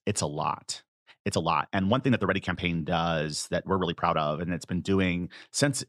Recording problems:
uneven, jittery; strongly; from 1 to 4 s

